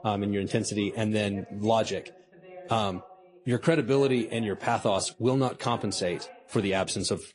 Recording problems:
garbled, watery; slightly; nothing above 10.5 kHz
voice in the background; faint; throughout; 20 dB below the speech

